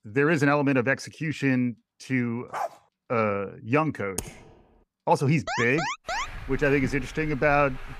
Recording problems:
traffic noise; noticeable; throughout; 15 dB below the speech
dog barking; noticeable; at 2.5 s; peak 8 dB below the speech
keyboard typing; faint; at 4 s; peak 10 dB below the speech
alarm; noticeable; at 5.5 s; peak 4 dB below the speech

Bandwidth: 14.5 kHz